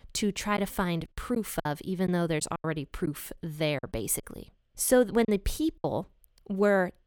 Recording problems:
choppy; very; 6% of the speech affected

